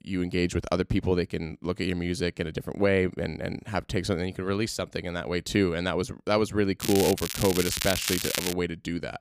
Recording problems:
crackling; loud; from 7 to 8.5 s; 2 dB below the speech

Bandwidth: 15 kHz